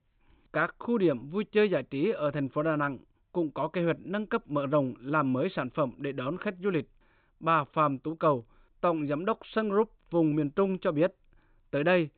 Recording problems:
high frequencies cut off; severe; nothing above 4 kHz

